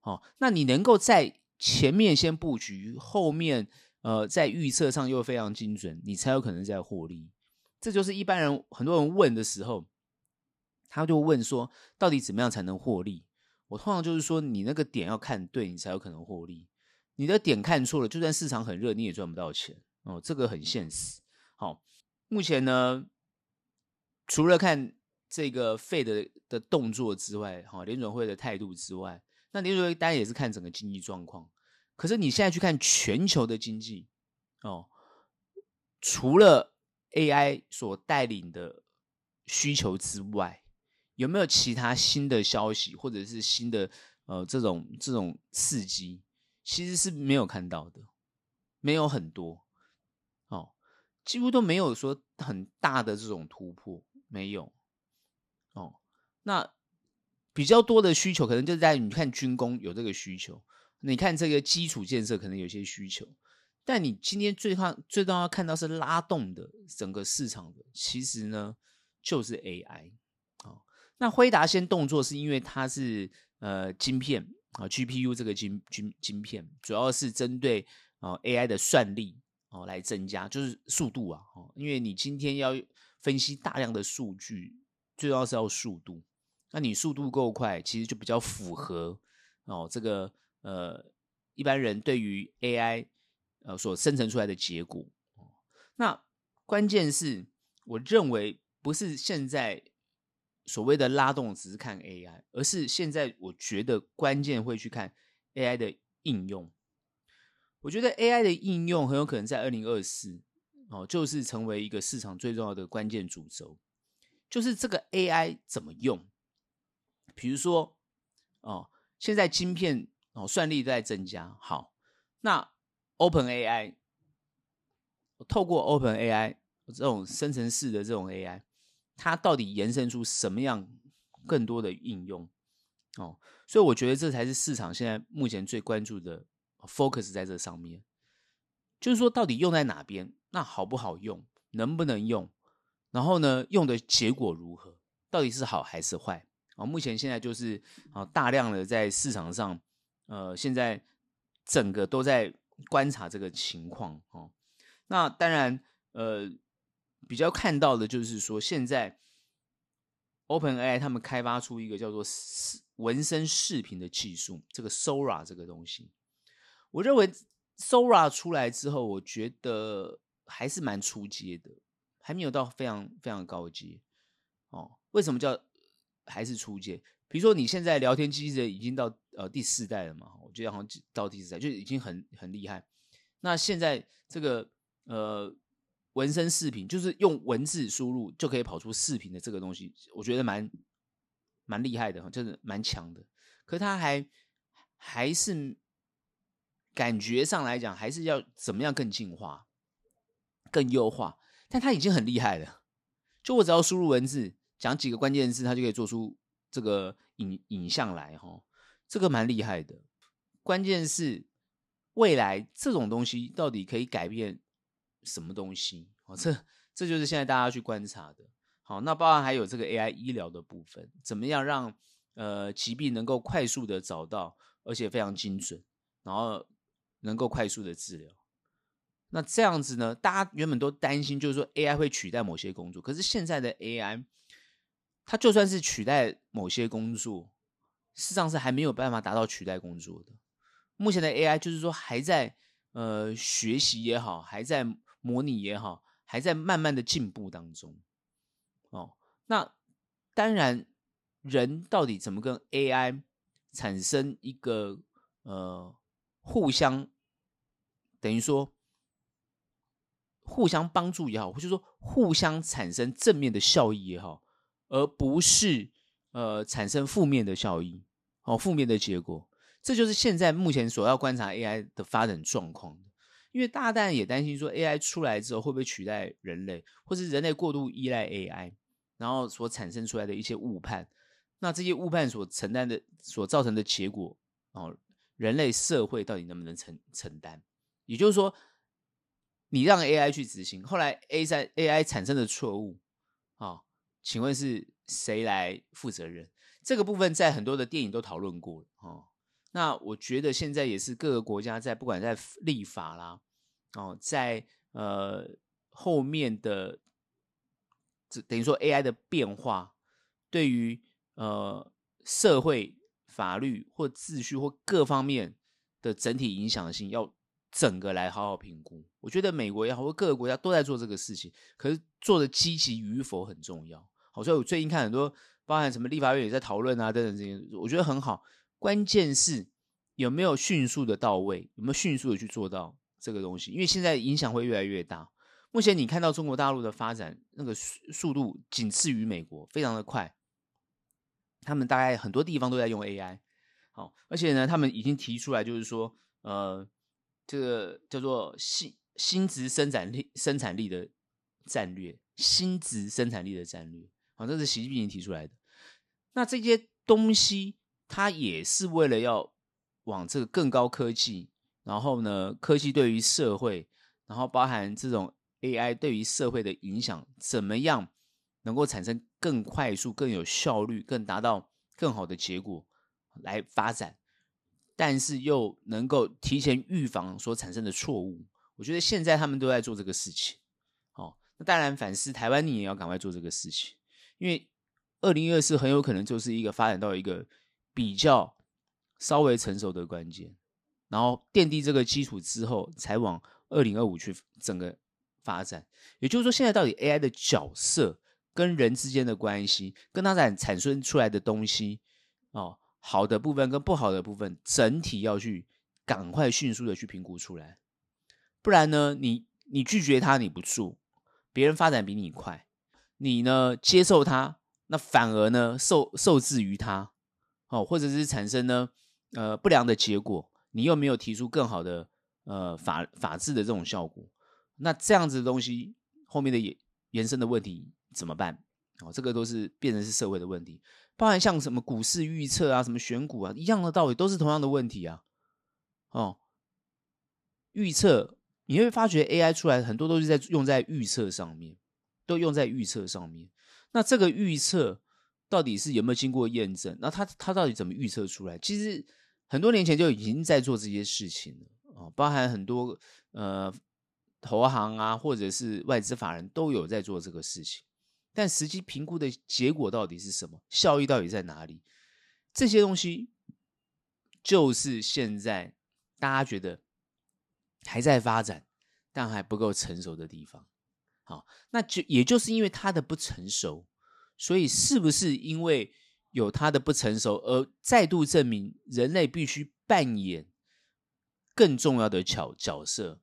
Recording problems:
none

